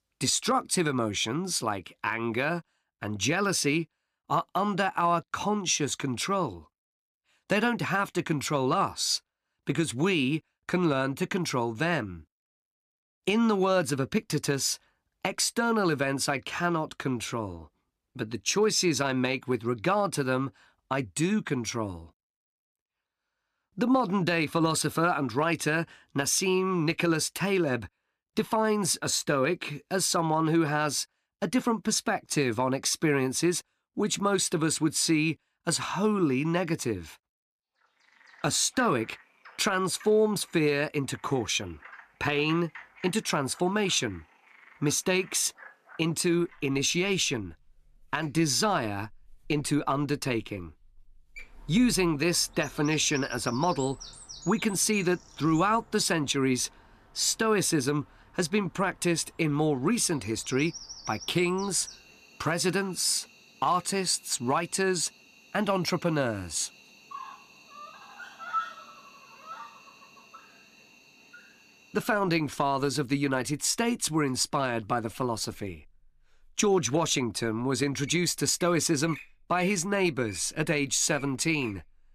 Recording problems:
animal sounds; noticeable; from 38 s on; 20 dB below the speech

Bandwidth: 14.5 kHz